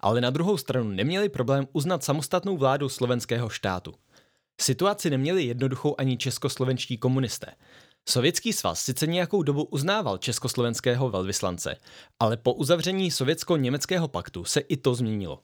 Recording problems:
none

